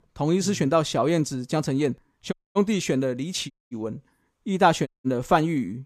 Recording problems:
audio cutting out; at 2.5 s, at 3.5 s and at 5 s

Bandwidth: 14.5 kHz